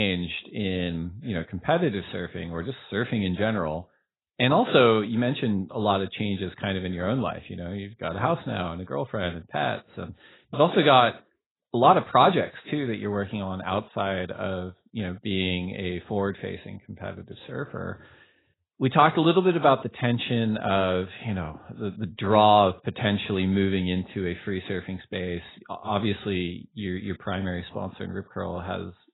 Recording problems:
garbled, watery; badly; nothing above 4 kHz
abrupt cut into speech; at the start

